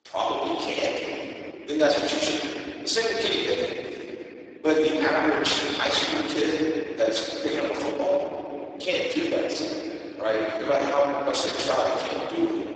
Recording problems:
room echo; strong; dies away in 3 s
off-mic speech; far
garbled, watery; badly; nothing above 7.5 kHz
thin; very slightly; fading below 300 Hz

